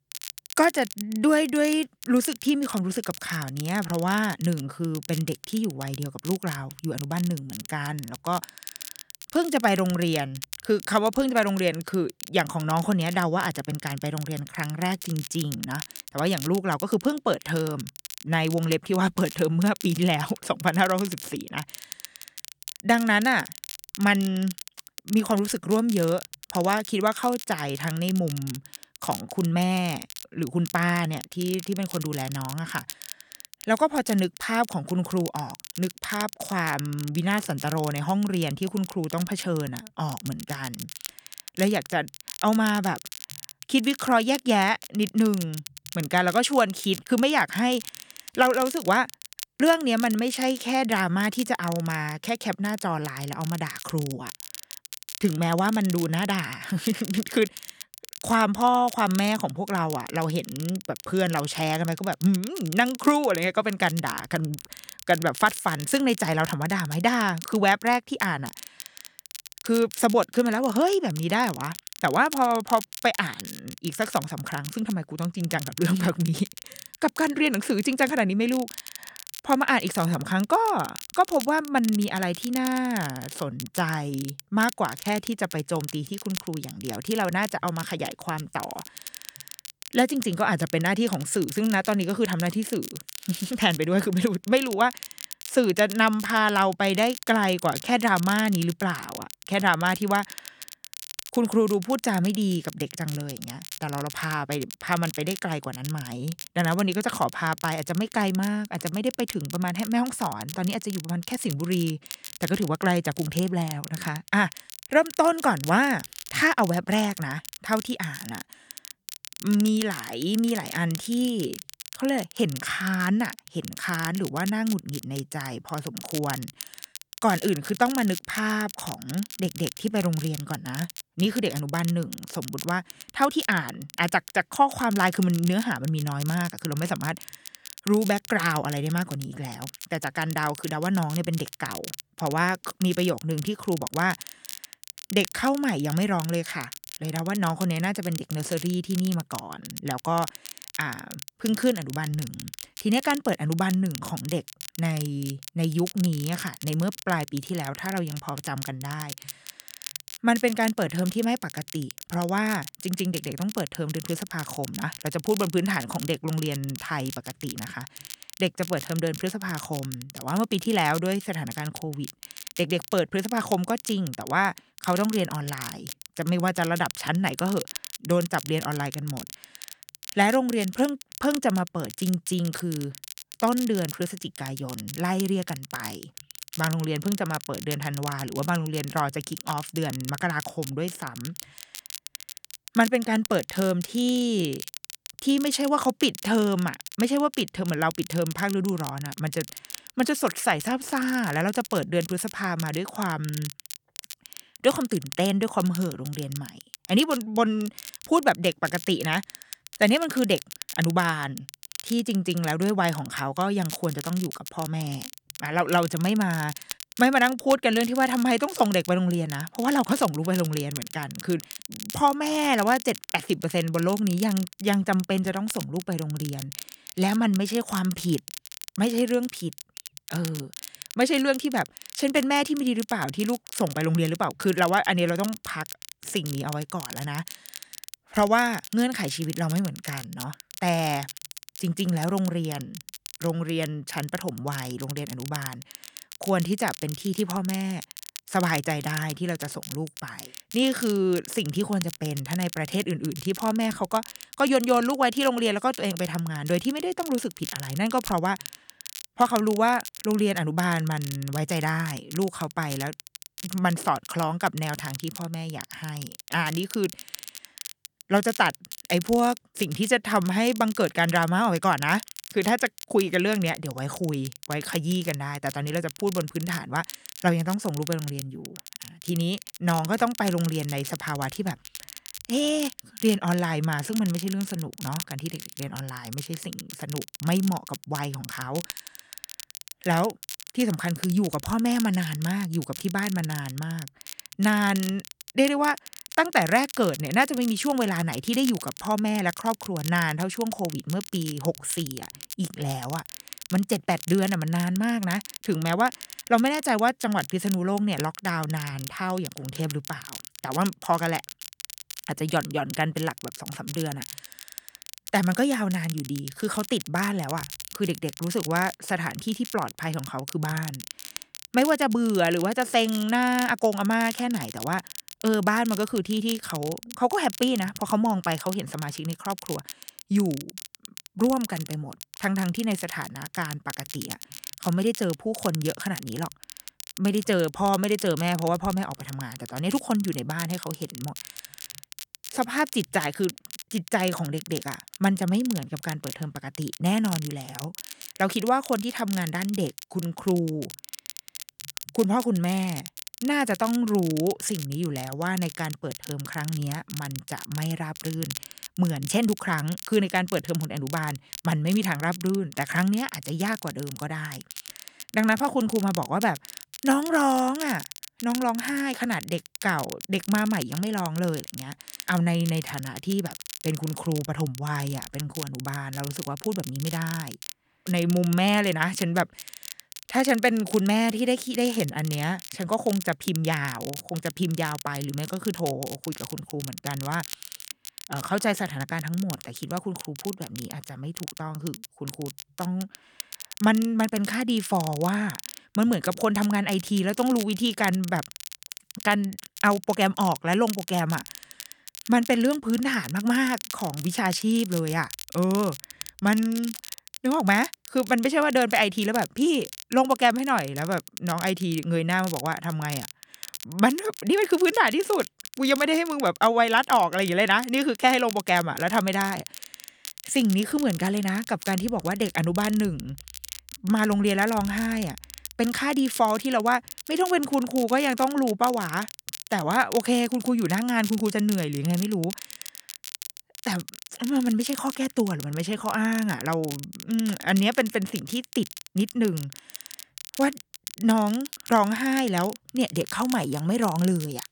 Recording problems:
crackle, like an old record; noticeable; 15 dB below the speech

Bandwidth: 18.5 kHz